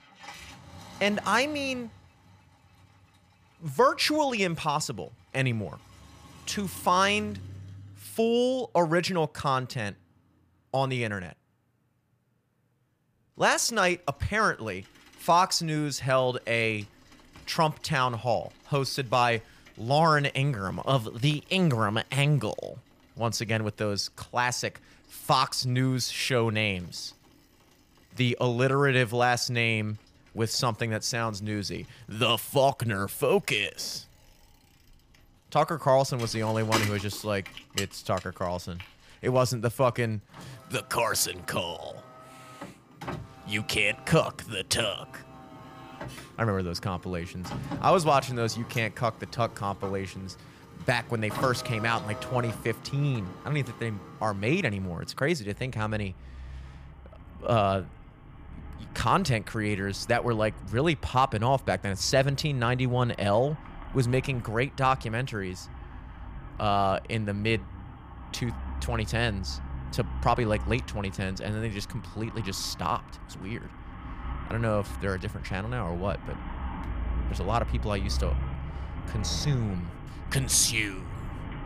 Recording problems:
traffic noise; noticeable; throughout; 15 dB below the speech

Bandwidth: 15 kHz